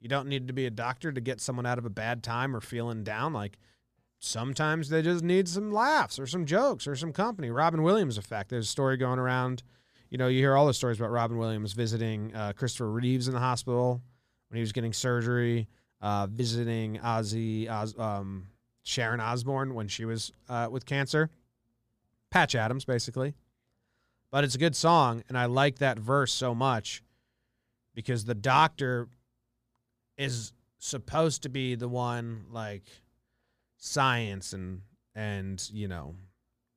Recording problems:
none

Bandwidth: 15 kHz